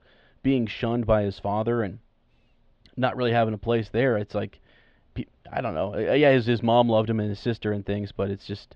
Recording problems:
muffled; very; fading above 3.5 kHz

